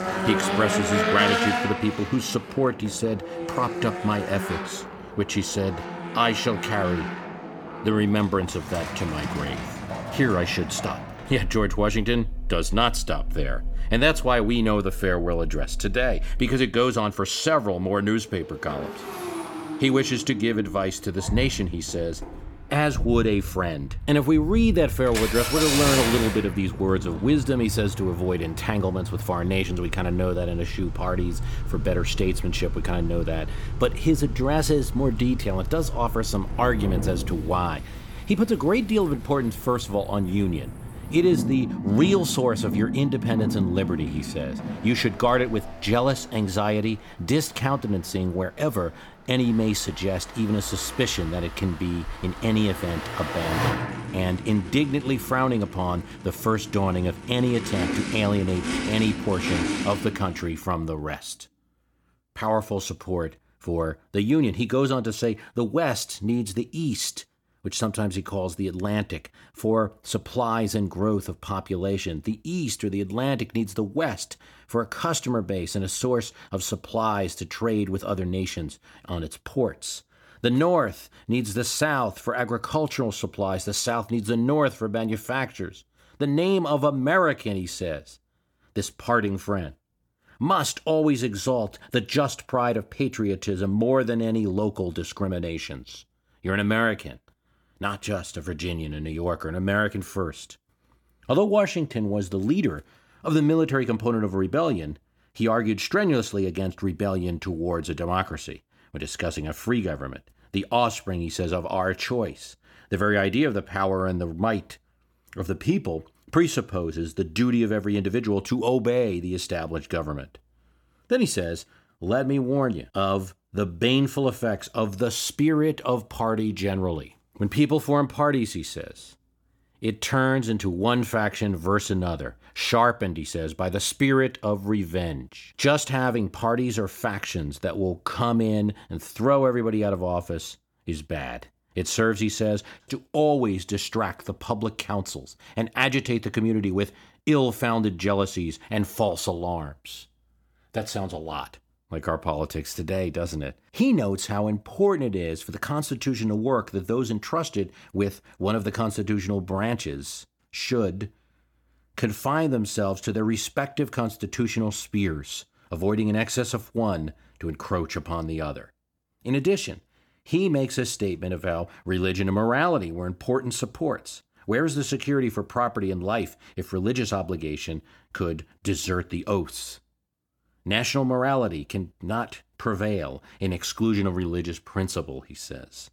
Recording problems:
traffic noise; loud; until 1:00; 6 dB below the speech

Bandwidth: 18.5 kHz